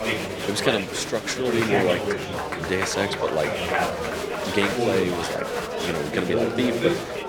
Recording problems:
chatter from many people; very loud; throughout; as loud as the speech

